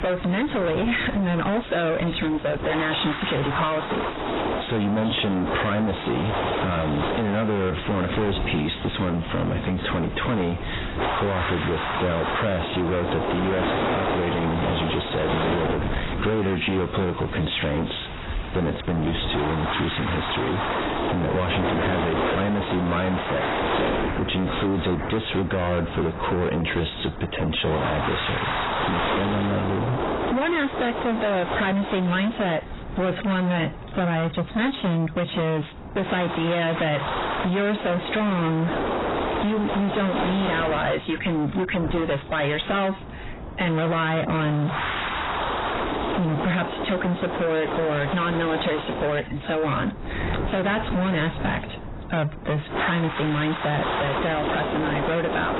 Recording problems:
distortion; heavy; 36% of the sound clipped
garbled, watery; badly; nothing above 4 kHz
squashed, flat; somewhat, background pumping
wind noise on the microphone; heavy; 2 dB below the speech
rain or running water; noticeable; throughout; 15 dB below the speech

